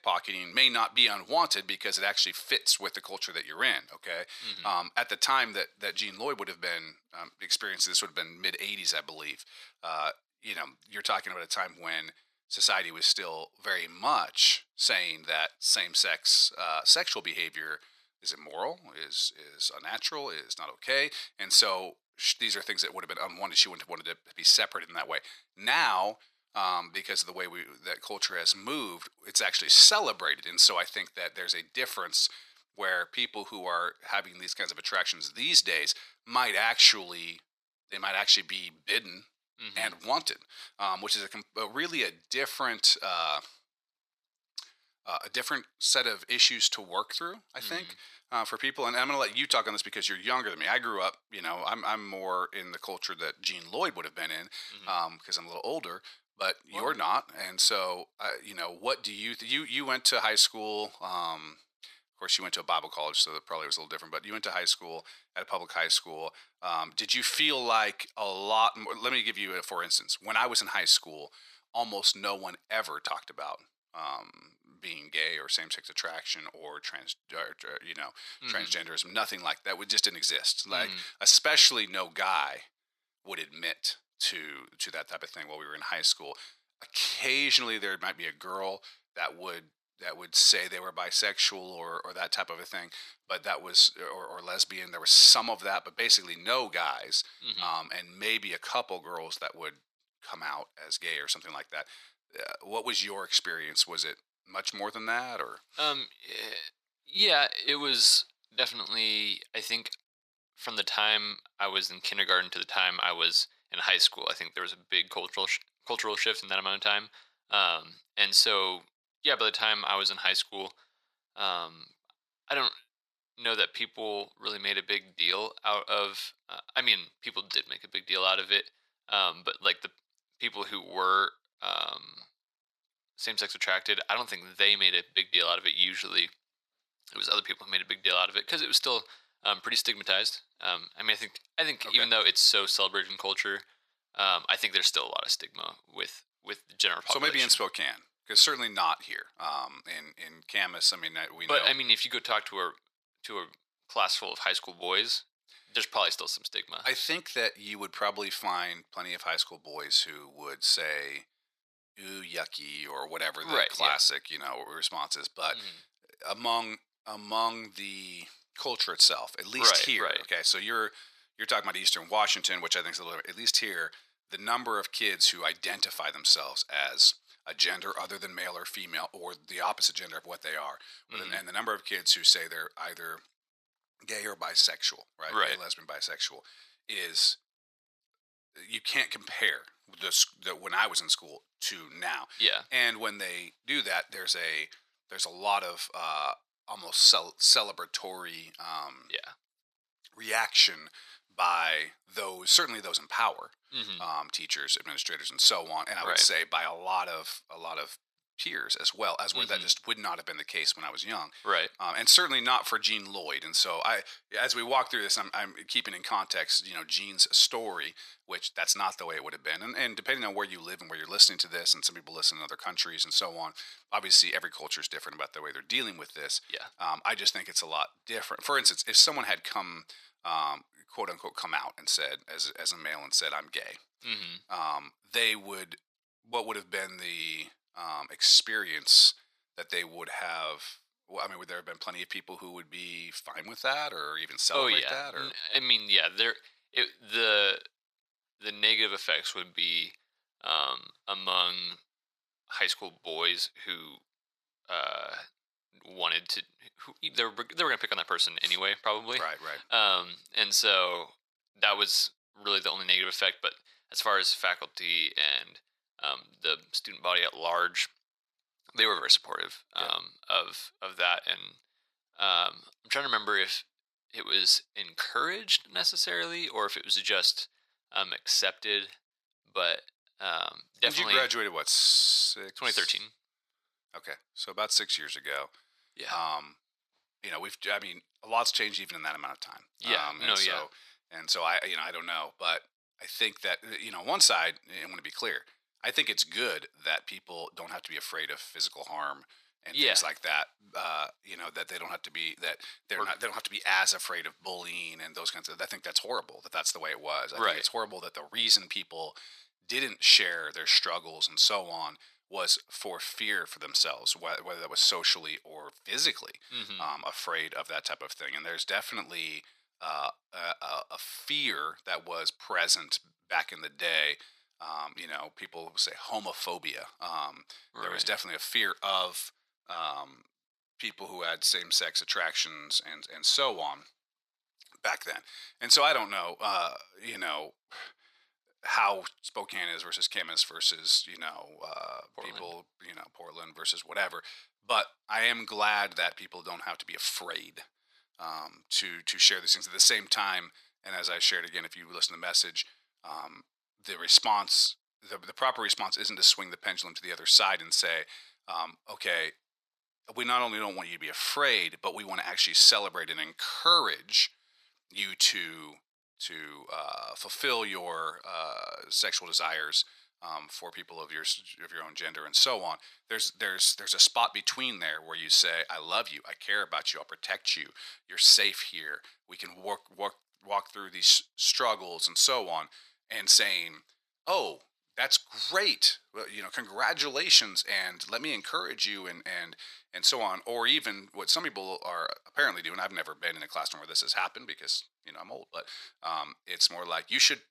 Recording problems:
thin; very; fading below 900 Hz

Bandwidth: 14.5 kHz